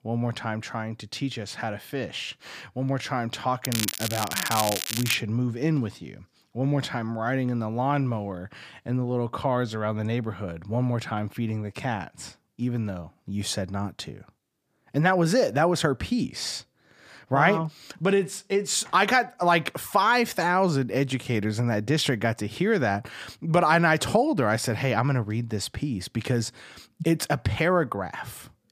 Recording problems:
crackling; loud; from 3.5 to 5 s; 3 dB below the speech

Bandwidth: 15 kHz